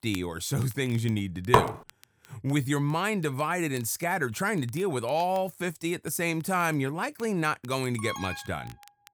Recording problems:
crackle, like an old record; faint; 25 dB below the speech
clattering dishes; loud; at 1.5 s; peak 5 dB above the speech
alarm; noticeable; at 8 s; peak 8 dB below the speech

